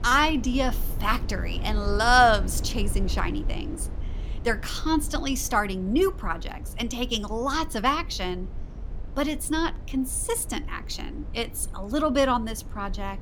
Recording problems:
low rumble; faint; throughout; 20 dB below the speech

